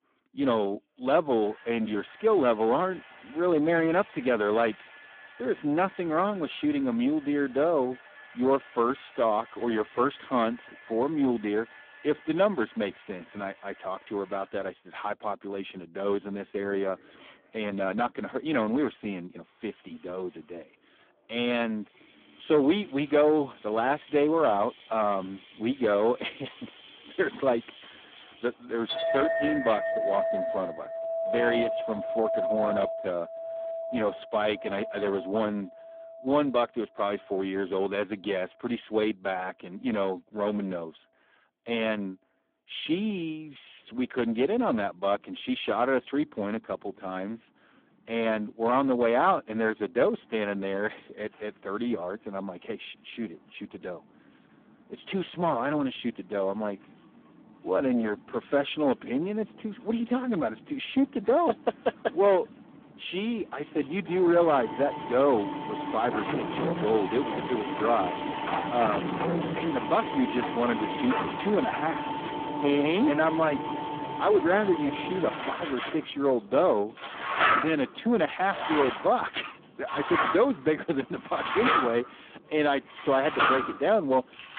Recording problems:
phone-call audio; poor line
distortion; slight; 10 dB below the speech
household noises; loud; throughout; 3 dB below the speech

